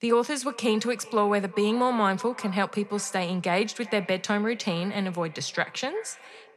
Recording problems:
echo of what is said; faint; throughout; 360 ms later, 20 dB below the speech

